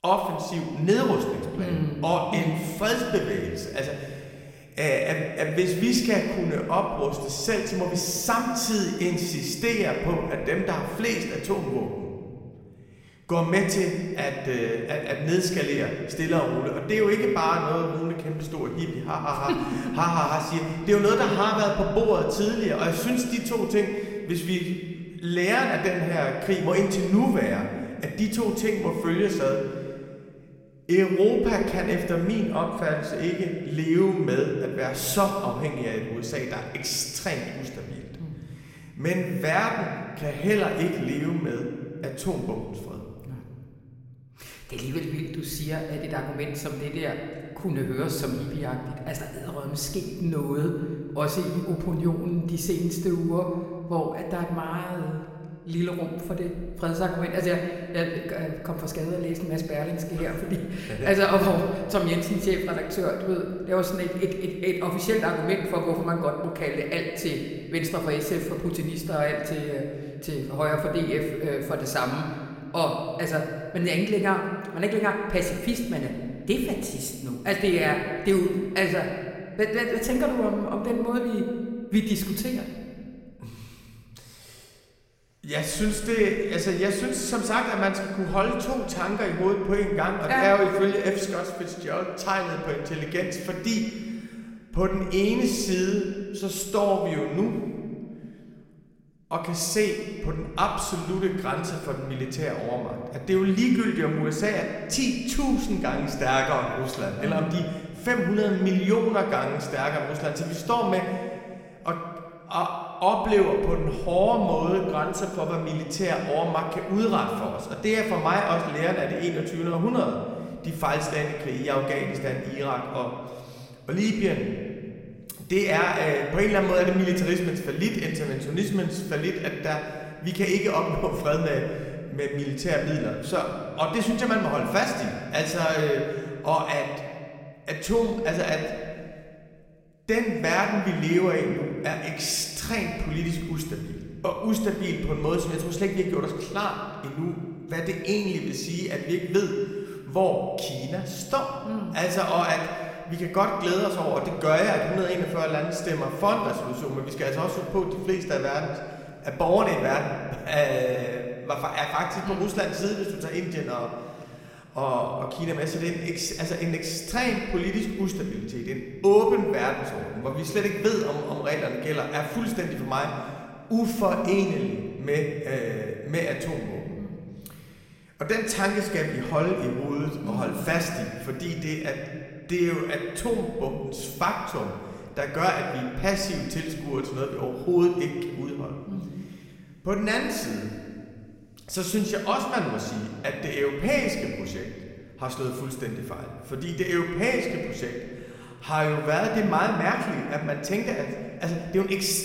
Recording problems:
room echo; noticeable; dies away in 1.8 s
off-mic speech; somewhat distant

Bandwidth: 16 kHz